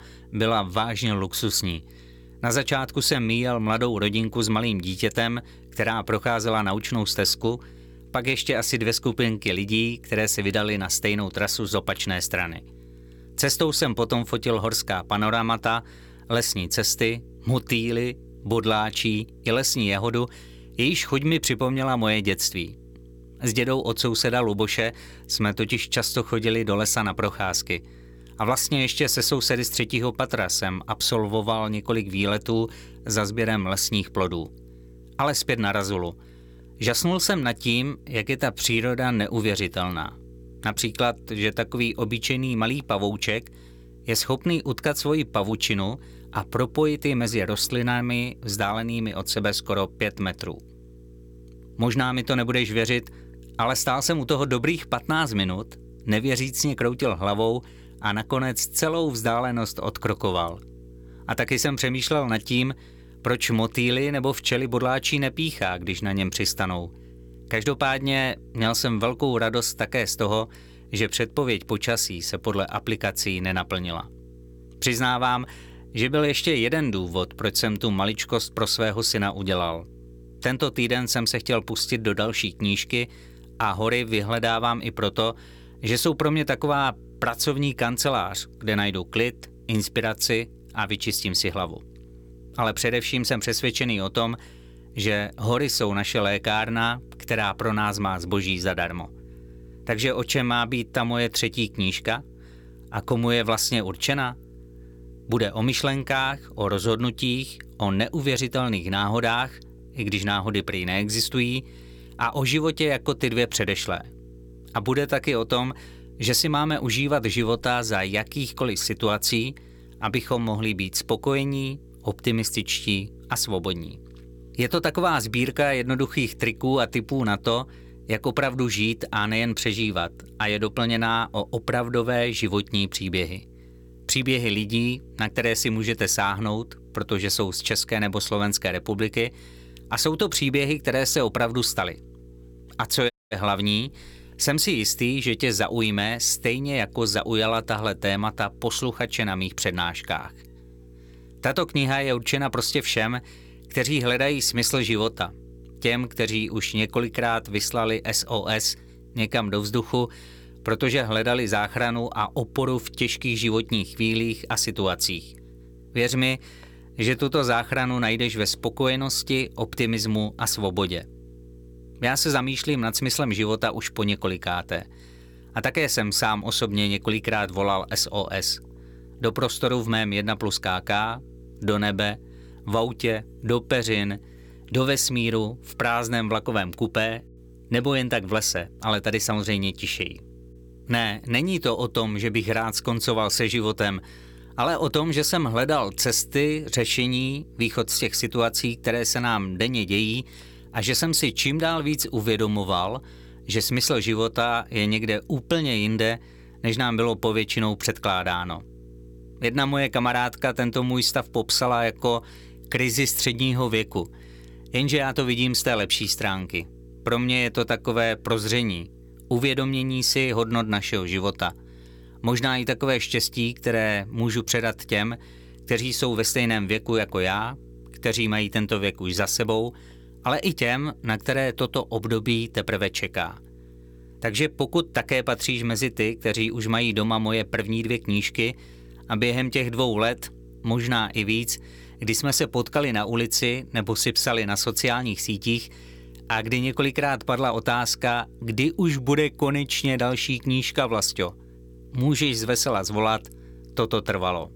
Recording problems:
electrical hum; faint; throughout; 60 Hz, 30 dB below the speech
audio cutting out; at 2:23

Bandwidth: 17.5 kHz